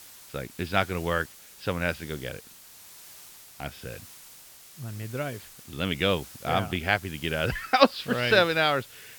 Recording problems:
high frequencies cut off; noticeable; nothing above 5.5 kHz
hiss; noticeable; throughout; 20 dB below the speech

